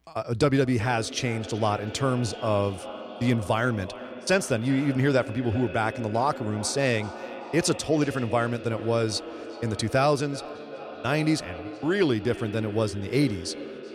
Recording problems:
echo of what is said; noticeable; throughout; 380 ms later, 10 dB below the speech

